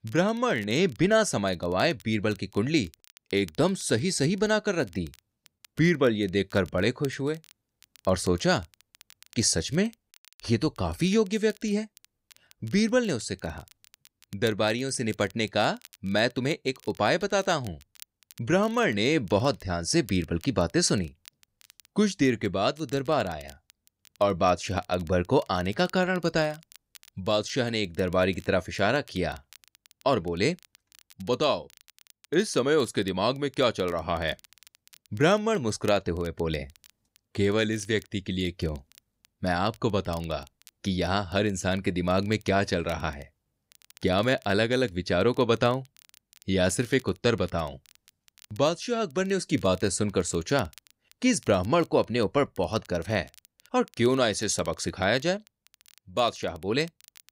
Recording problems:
crackle, like an old record; faint; 25 dB below the speech

